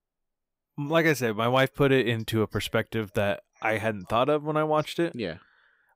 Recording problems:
none

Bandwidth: 15.5 kHz